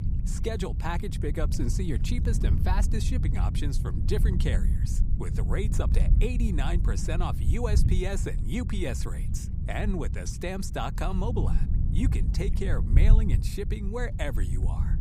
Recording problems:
wind noise on the microphone; heavy; 7 dB below the speech

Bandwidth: 15.5 kHz